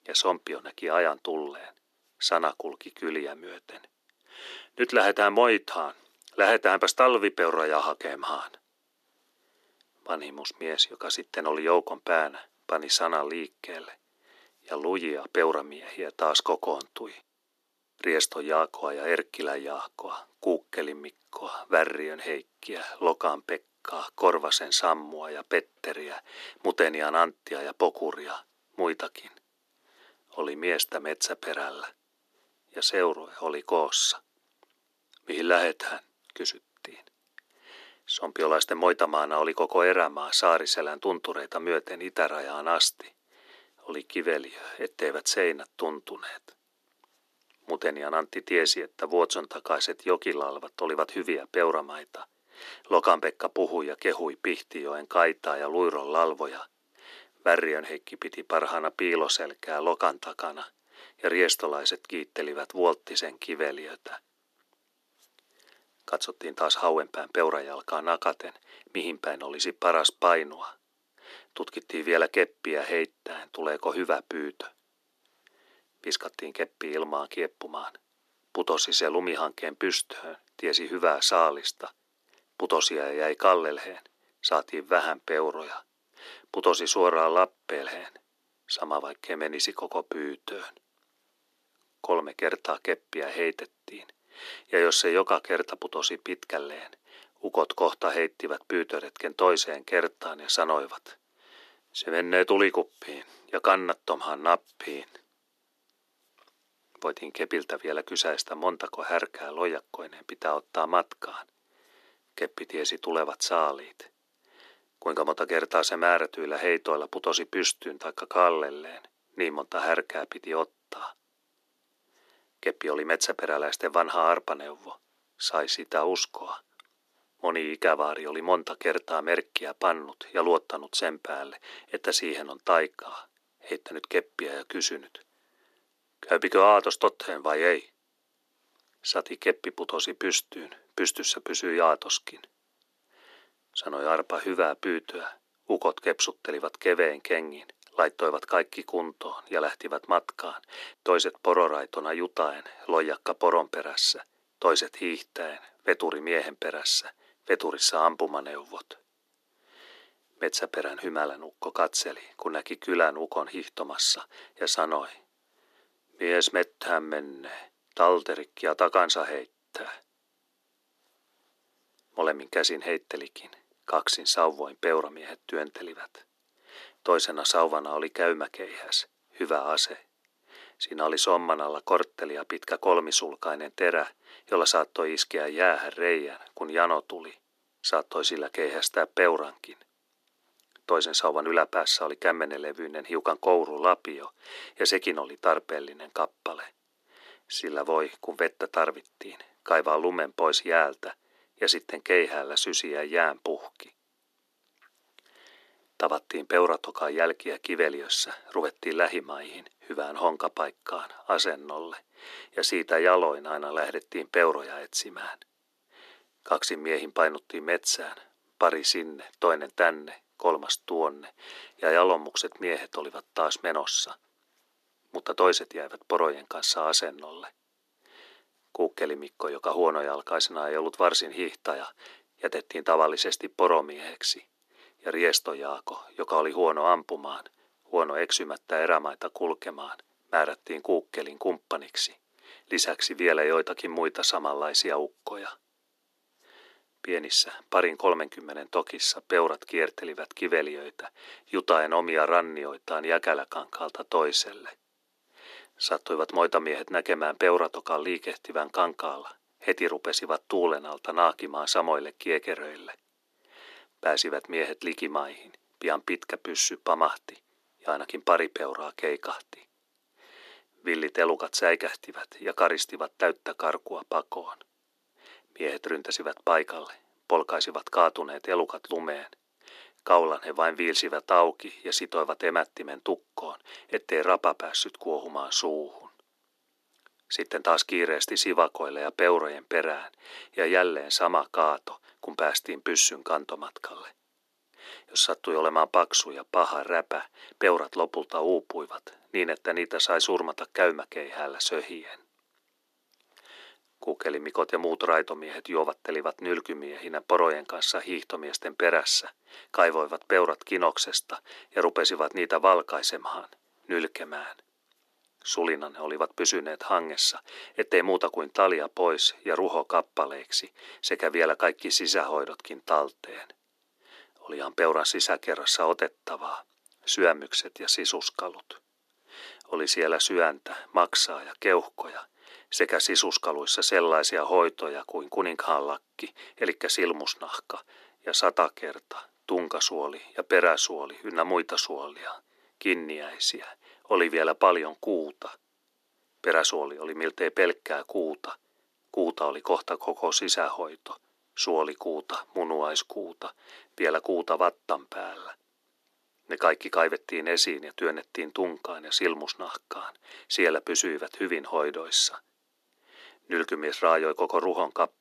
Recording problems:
thin; somewhat; fading below 300 Hz

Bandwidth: 13.5 kHz